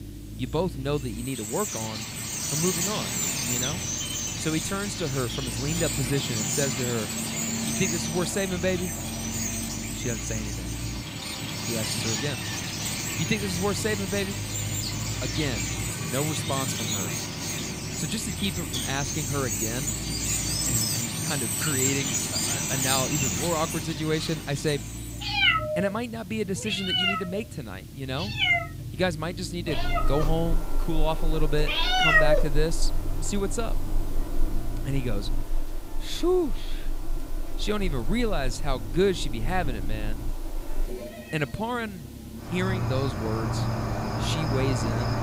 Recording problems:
animal sounds; very loud; throughout; 2 dB above the speech
low rumble; noticeable; throughout; 20 dB below the speech
hiss; faint; throughout; 20 dB below the speech

